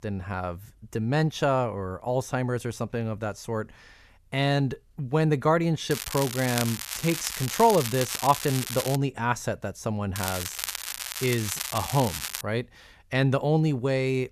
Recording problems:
crackling; loud; from 6 to 9 s and from 10 to 12 s; 5 dB below the speech

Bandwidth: 14.5 kHz